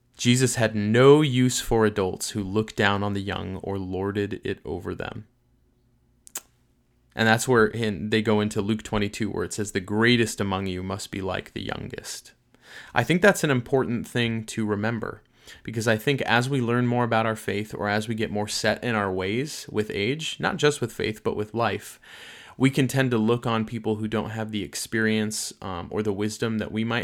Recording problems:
abrupt cut into speech; at the end

